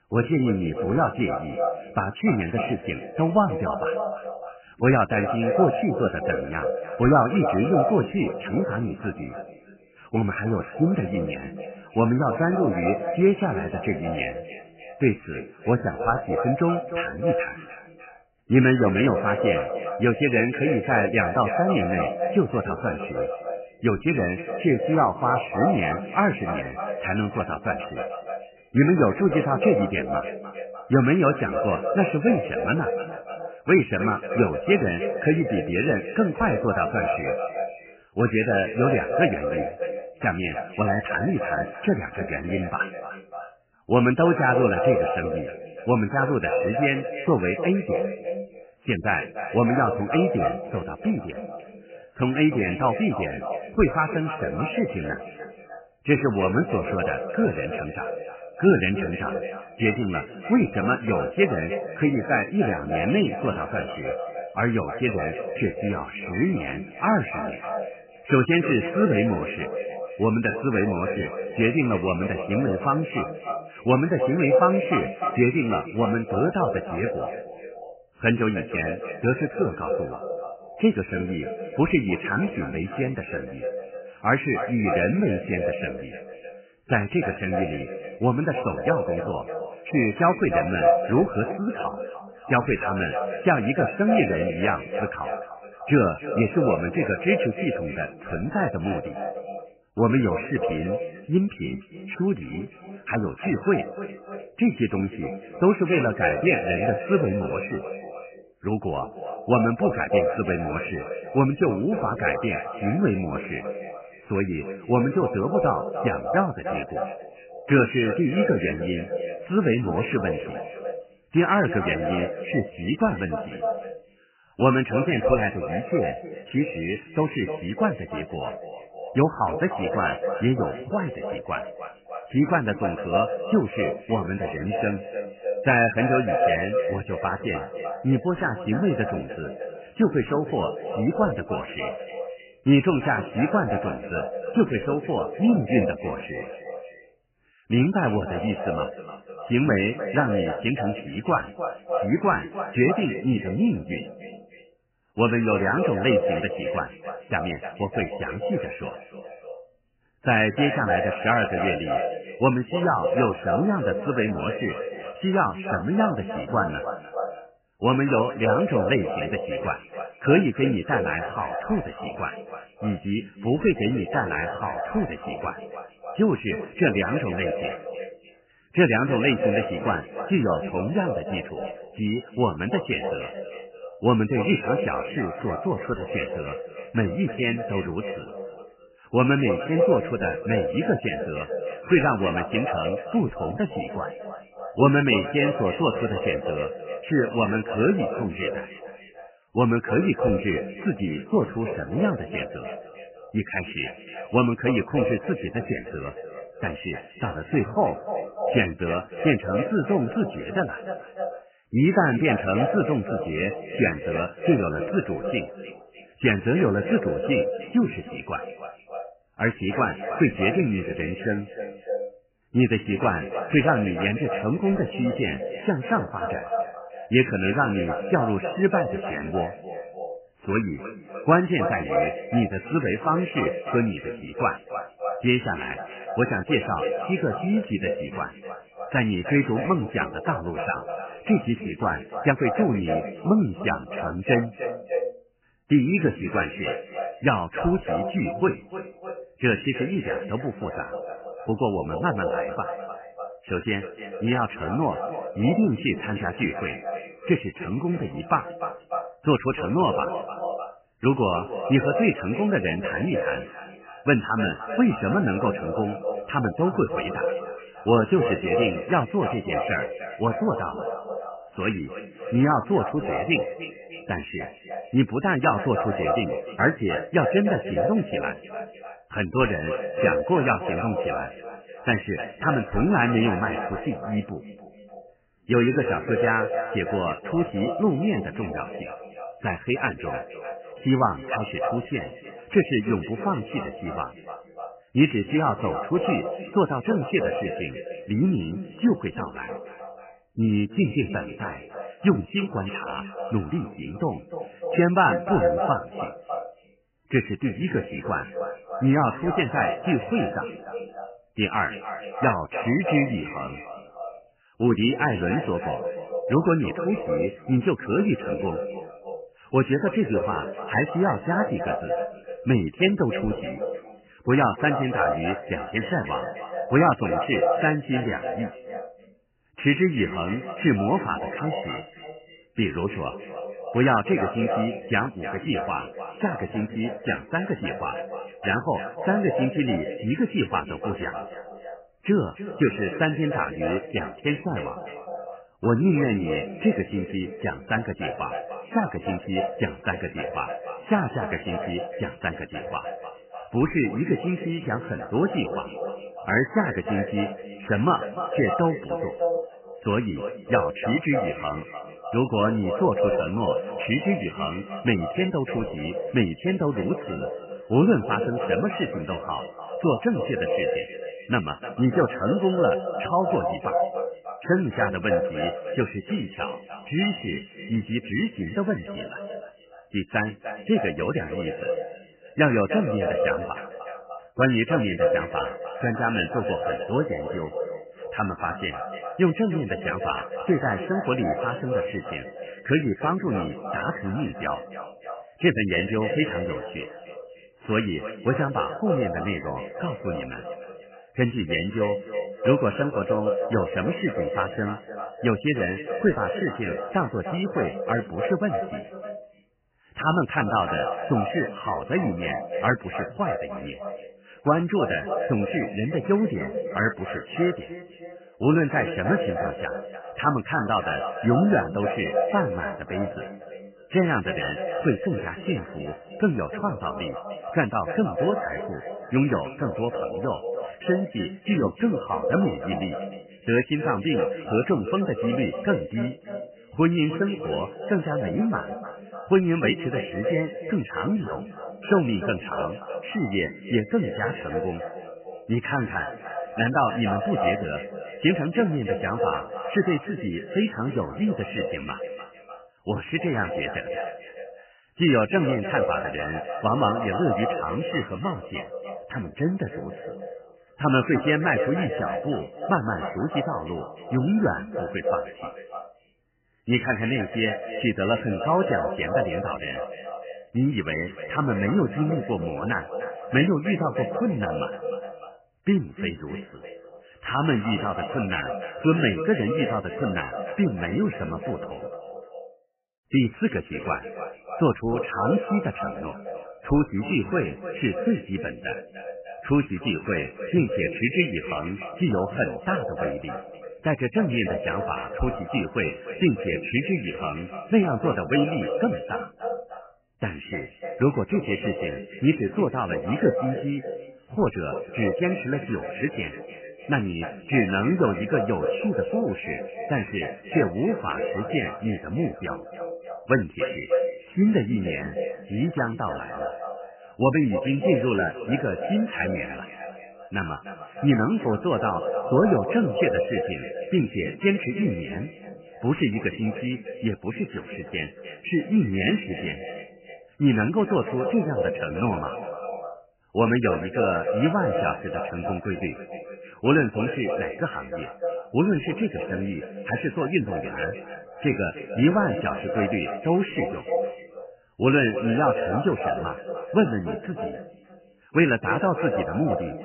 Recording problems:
echo of what is said; strong; throughout; 300 ms later, 6 dB below the speech
garbled, watery; badly; nothing above 3 kHz
uneven, jittery; slightly; from 4:02 to 8:19

